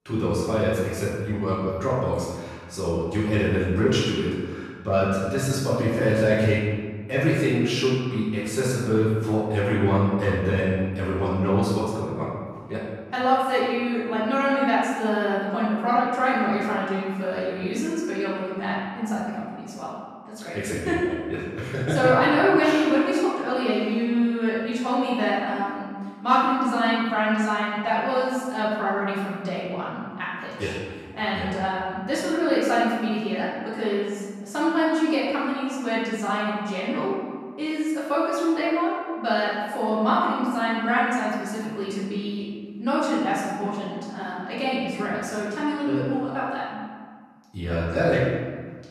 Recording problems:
room echo; strong; dies away in 1.5 s
off-mic speech; far

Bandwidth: 13.5 kHz